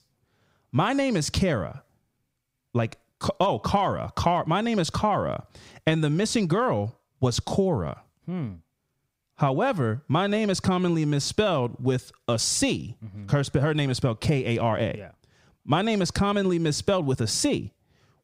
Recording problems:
squashed, flat; somewhat

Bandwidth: 15.5 kHz